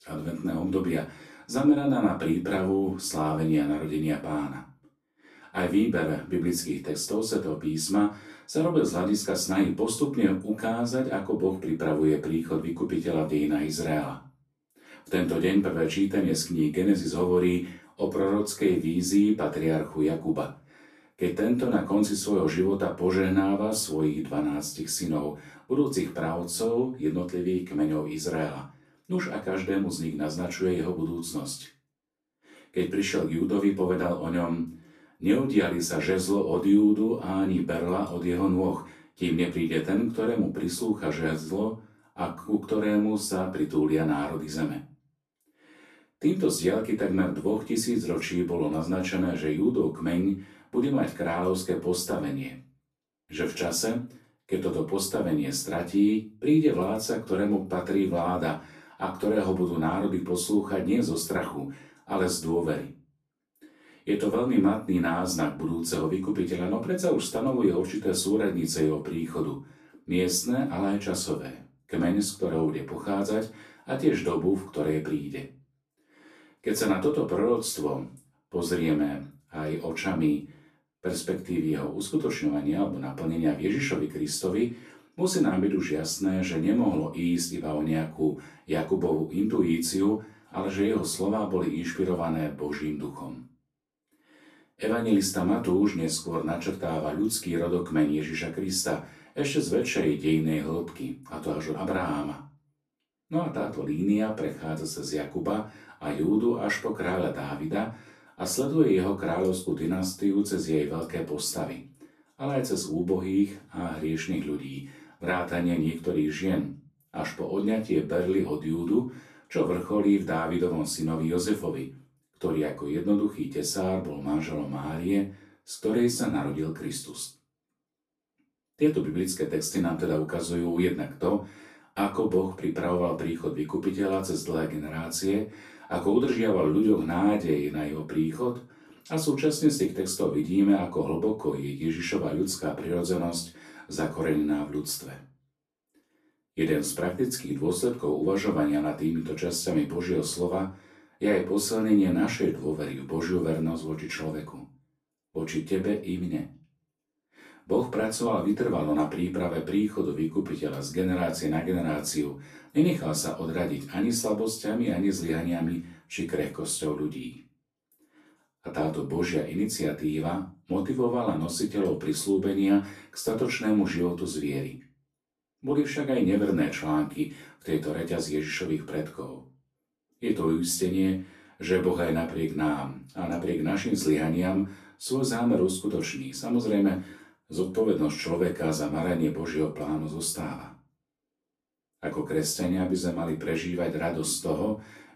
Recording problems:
off-mic speech; far
room echo; slight; dies away in 0.3 s

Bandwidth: 14 kHz